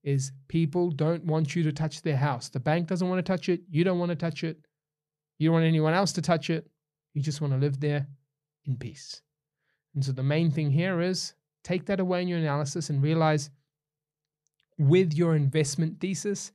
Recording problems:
none

